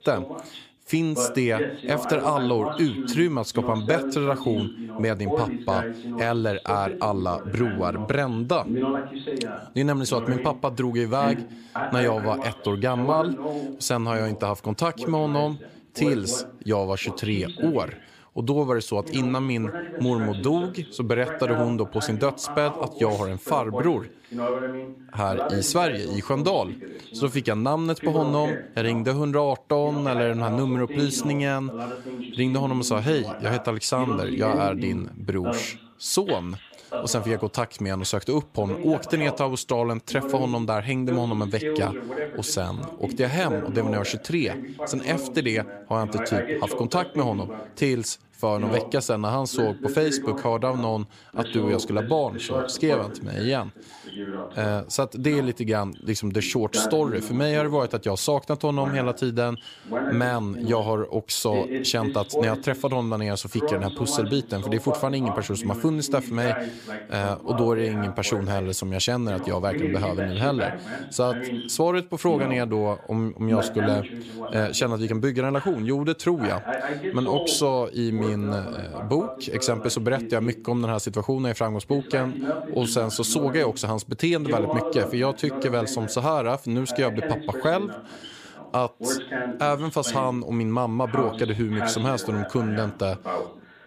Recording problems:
voice in the background; loud; throughout; 7 dB below the speech

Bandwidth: 15 kHz